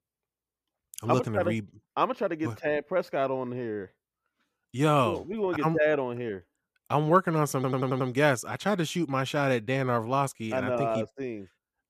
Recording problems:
audio stuttering; at 7.5 s

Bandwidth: 14.5 kHz